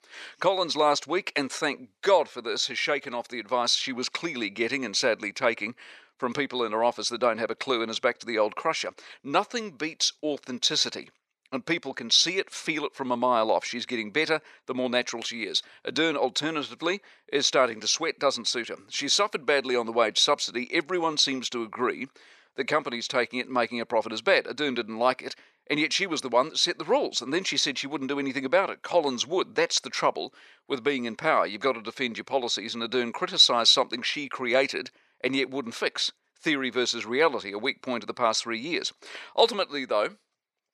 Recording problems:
thin; somewhat; fading below 500 Hz

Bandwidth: 13.5 kHz